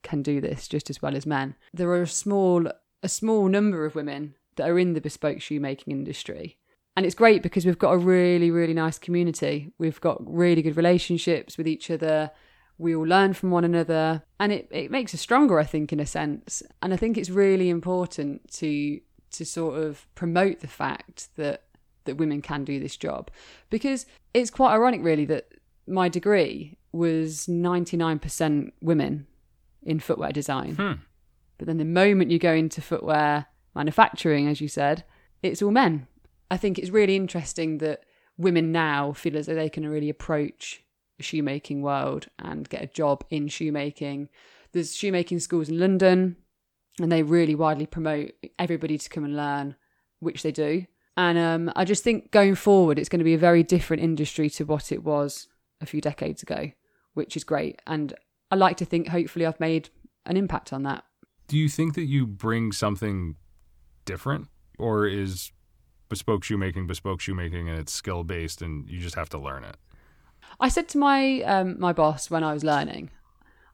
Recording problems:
none

